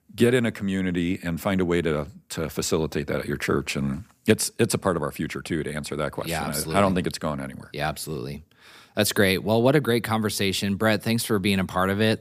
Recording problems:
none

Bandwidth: 15 kHz